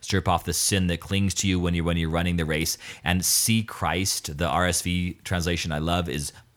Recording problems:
none

